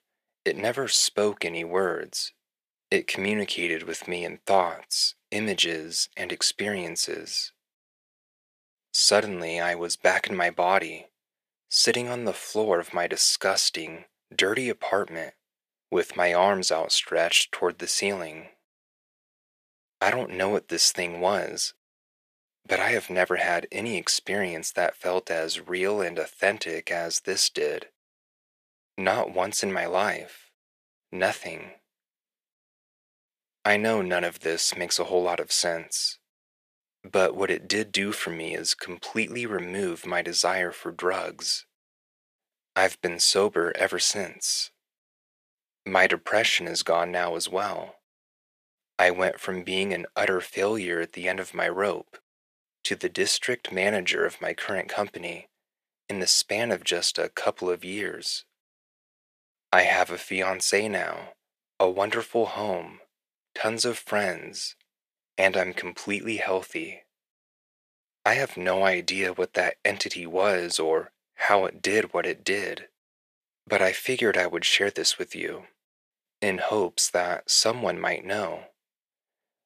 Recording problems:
thin; very; fading below 500 Hz

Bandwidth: 14.5 kHz